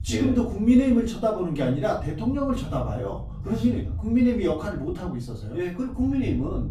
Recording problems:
off-mic speech; far
room echo; slight; dies away in 0.5 s
low rumble; faint; throughout; 25 dB below the speech

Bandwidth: 14.5 kHz